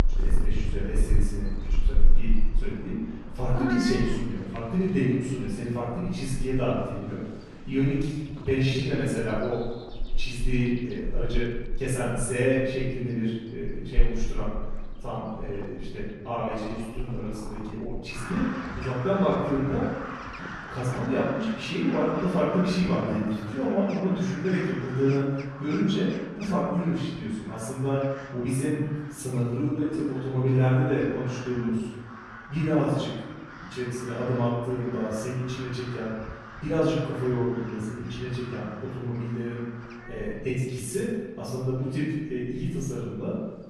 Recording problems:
room echo; strong; dies away in 1.1 s
off-mic speech; far
animal sounds; loud; throughout; 9 dB below the speech
uneven, jittery; strongly; from 8 to 41 s

